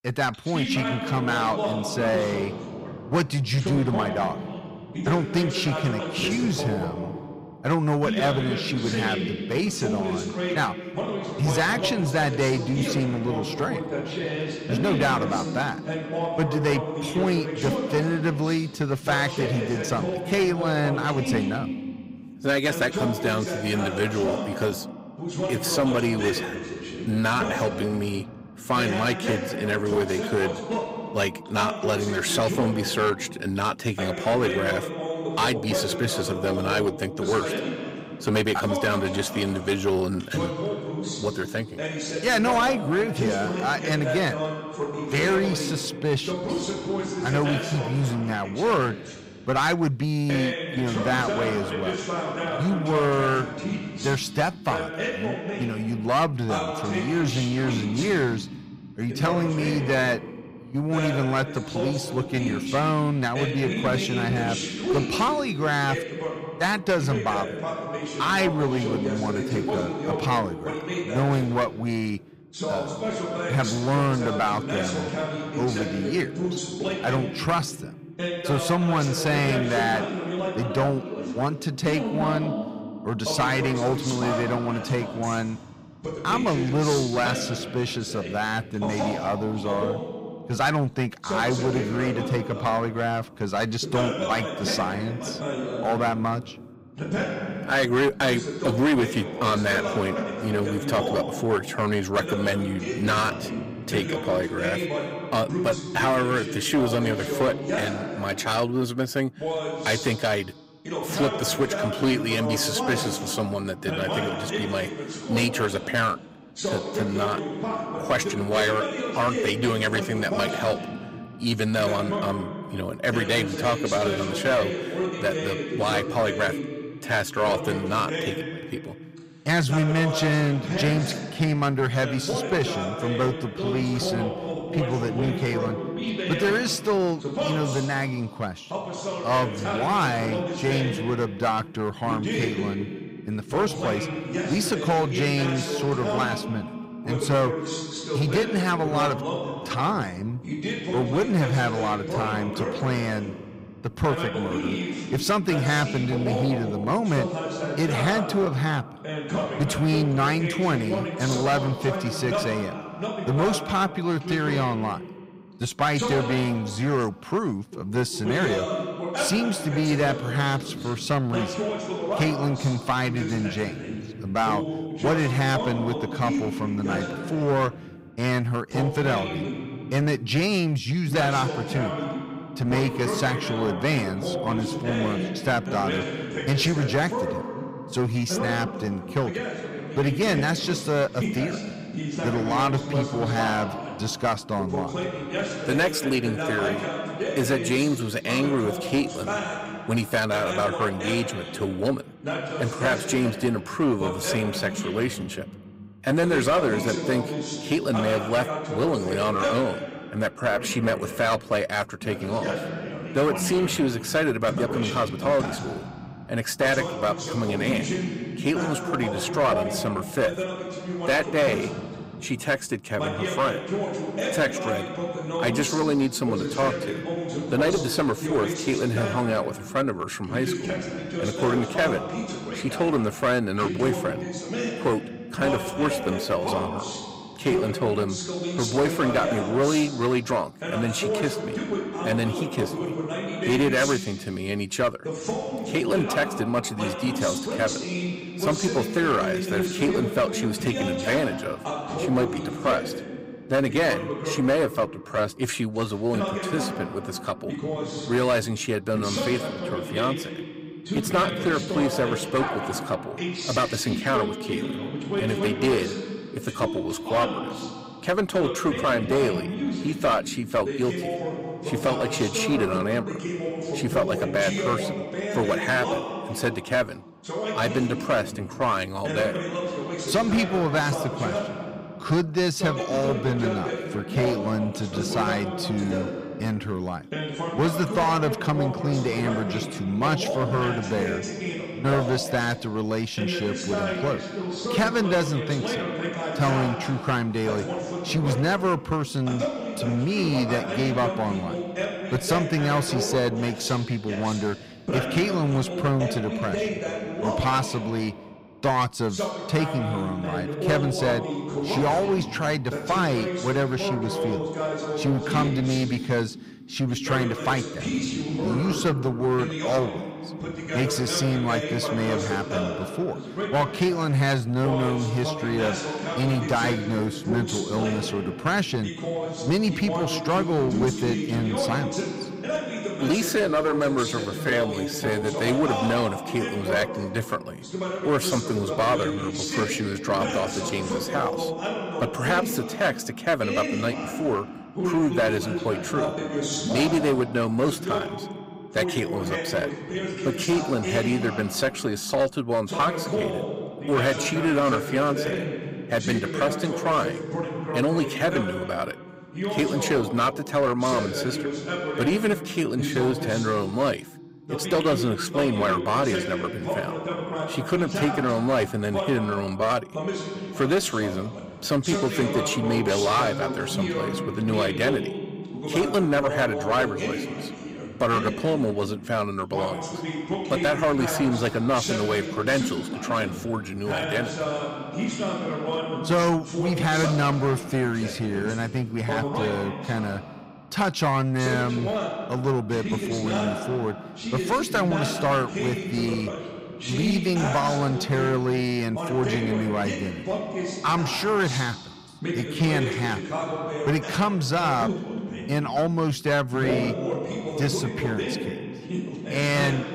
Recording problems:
distortion; slight; 7% of the sound clipped
voice in the background; loud; throughout; 5 dB below the speech
uneven, jittery; strongly; from 1:46 to 6:33

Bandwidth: 15.5 kHz